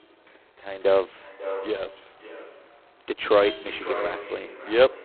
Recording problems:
phone-call audio; poor line; nothing above 4 kHz
echo of what is said; strong; throughout; 550 ms later, 10 dB below the speech
traffic noise; noticeable; throughout; 20 dB below the speech

